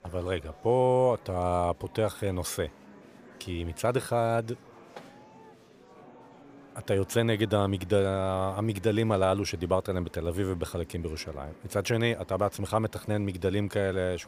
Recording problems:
murmuring crowd; faint; throughout; 25 dB below the speech

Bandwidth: 15 kHz